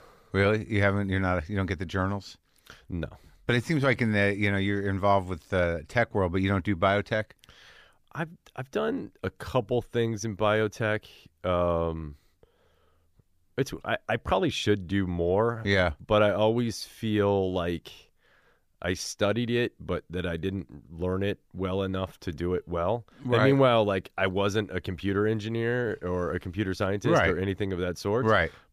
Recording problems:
none

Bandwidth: 15 kHz